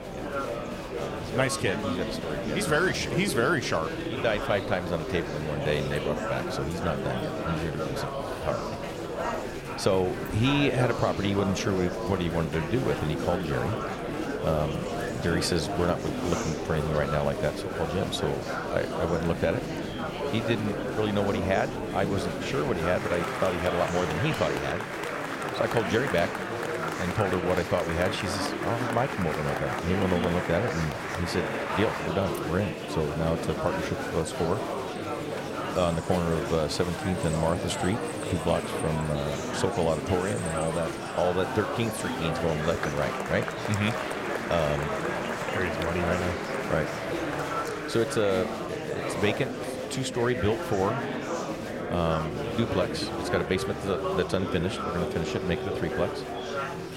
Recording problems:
murmuring crowd; loud; throughout; 2 dB below the speech

